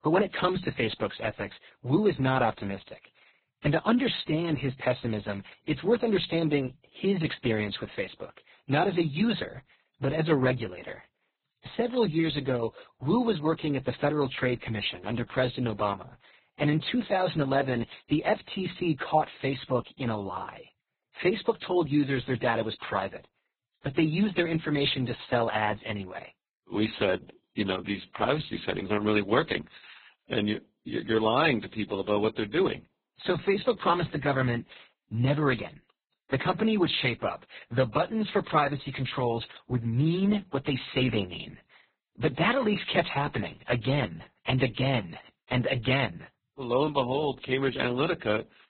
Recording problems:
garbled, watery; badly; nothing above 4 kHz

